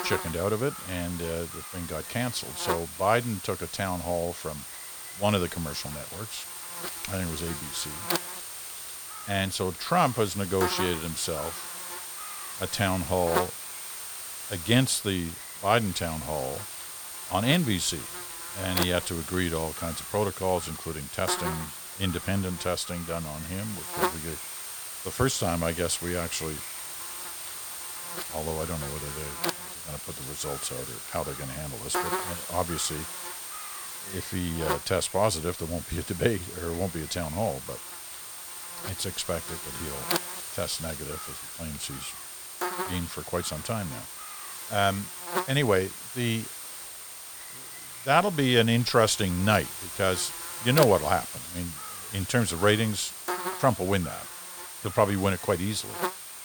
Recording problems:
electrical hum; loud; throughout; 50 Hz, 8 dB below the speech

